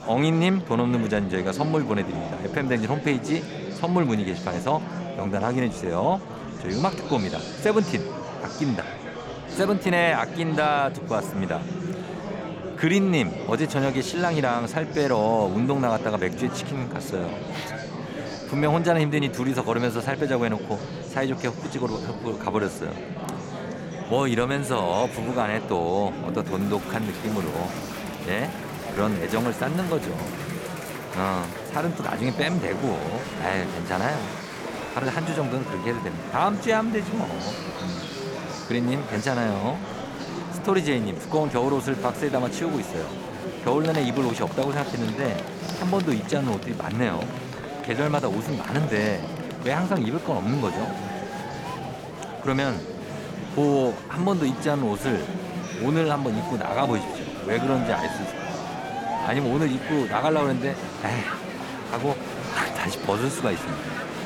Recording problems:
murmuring crowd; loud; throughout; 7 dB below the speech

